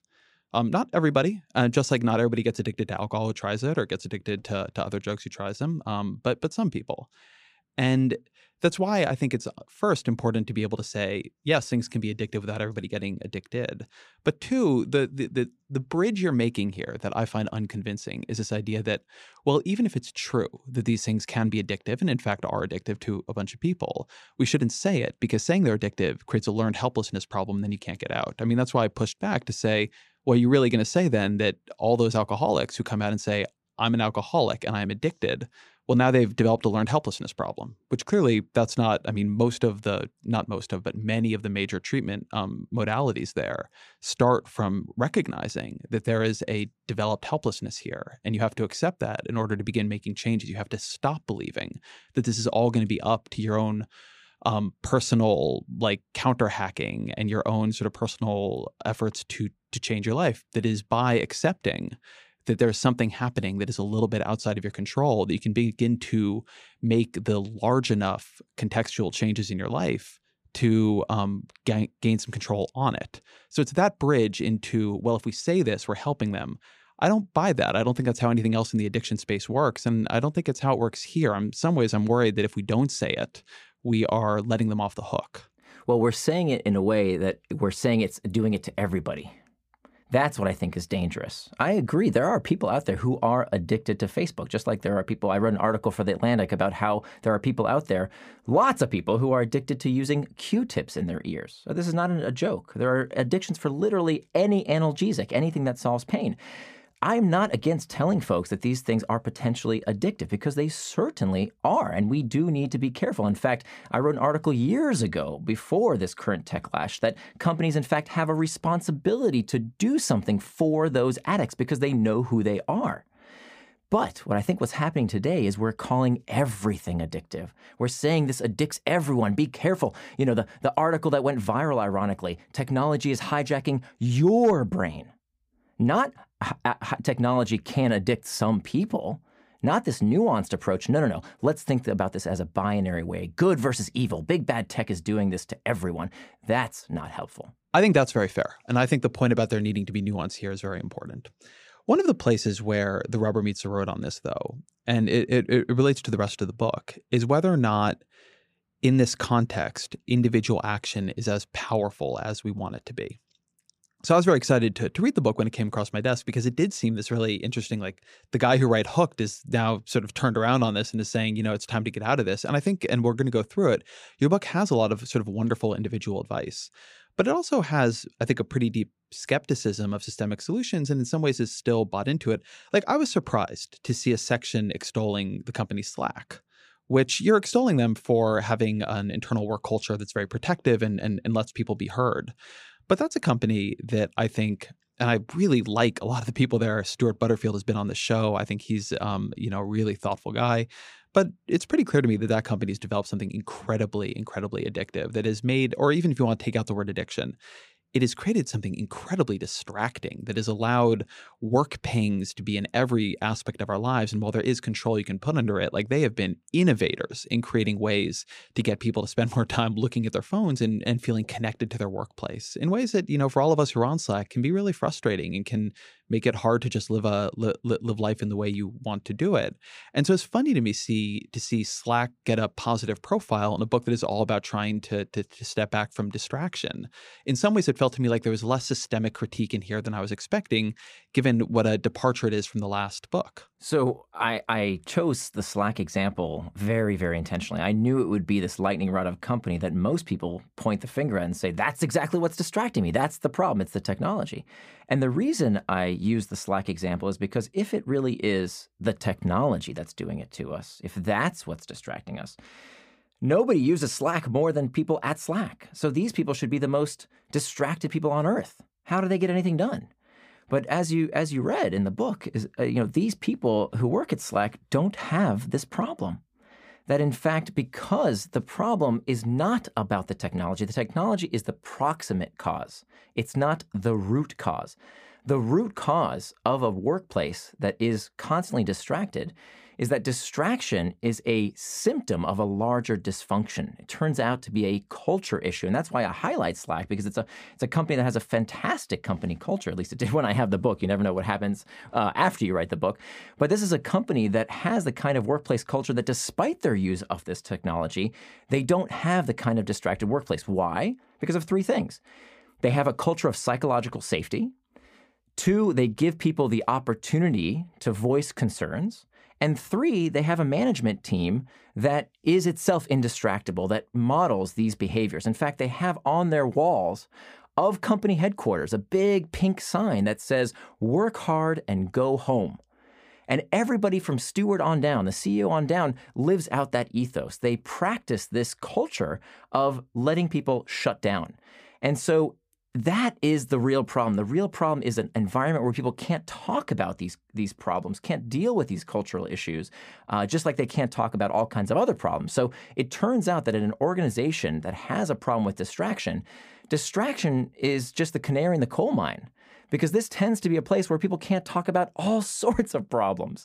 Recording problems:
none

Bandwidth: 15 kHz